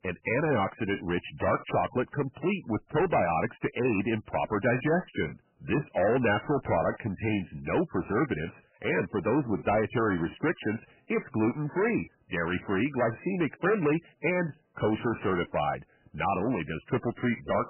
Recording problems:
distortion; heavy; 9% of the sound clipped
garbled, watery; badly; nothing above 3 kHz

